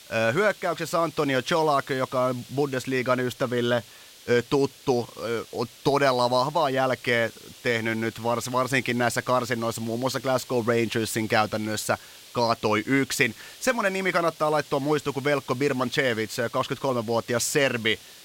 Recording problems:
hiss; noticeable; throughout; 20 dB below the speech

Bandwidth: 16 kHz